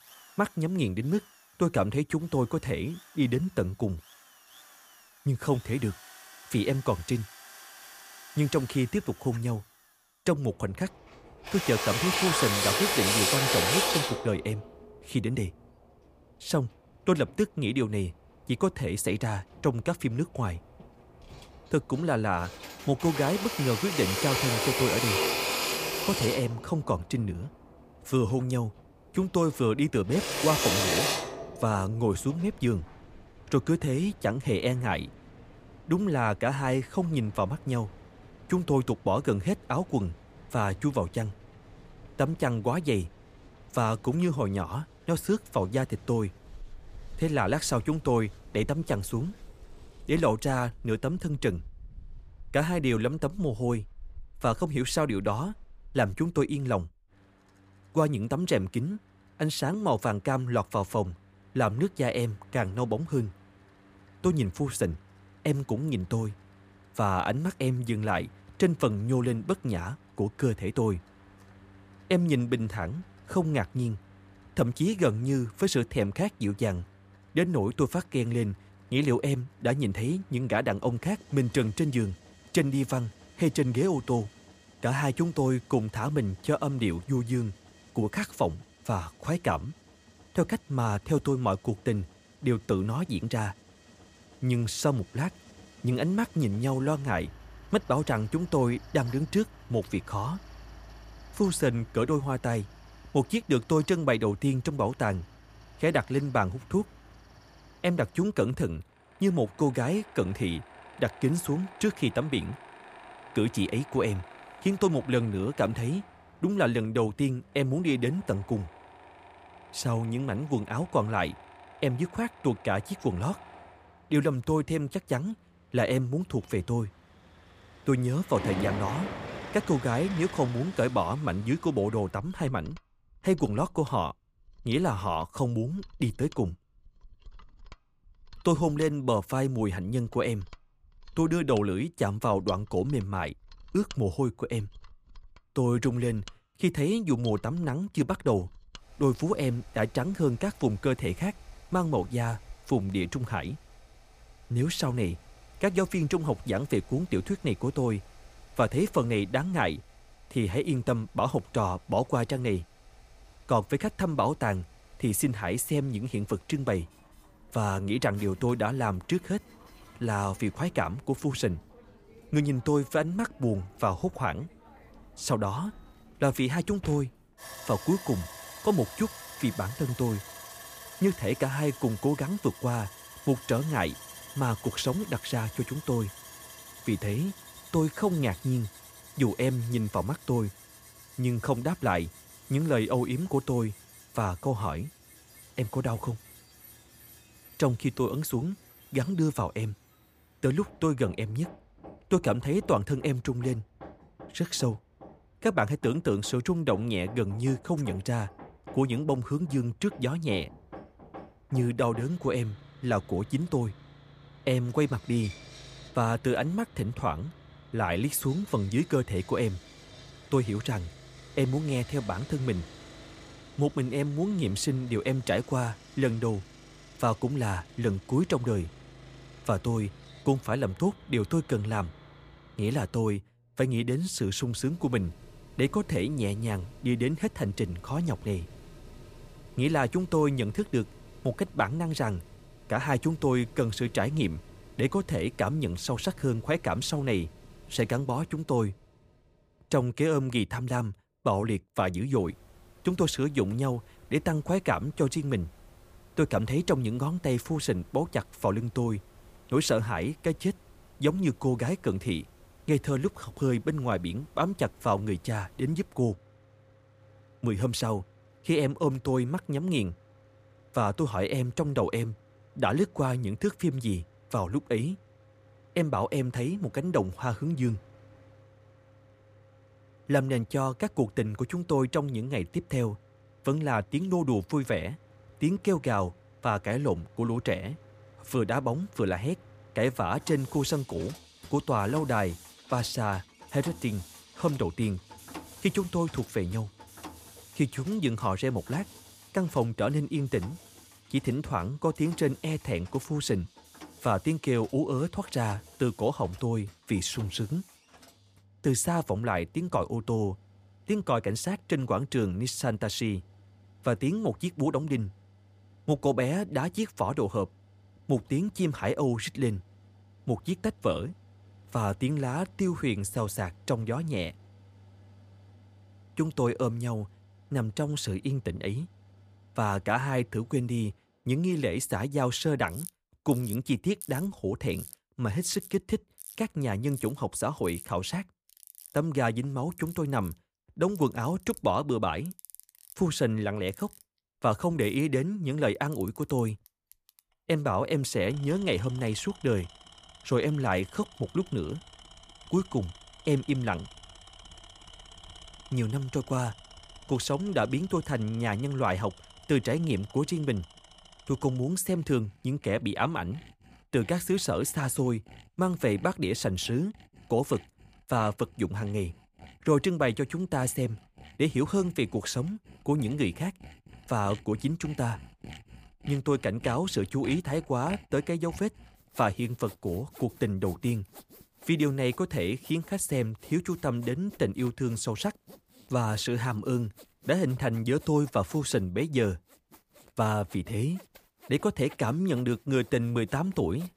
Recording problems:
machinery noise; noticeable; throughout; 10 dB below the speech

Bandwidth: 15 kHz